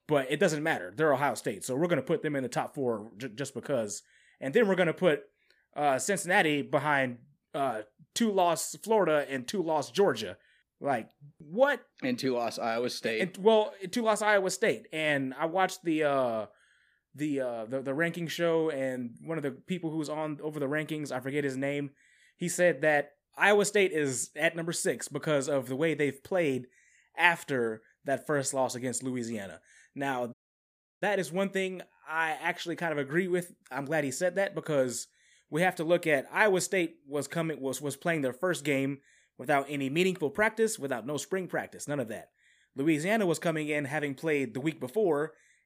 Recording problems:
audio cutting out; at 30 s for 0.5 s

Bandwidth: 15 kHz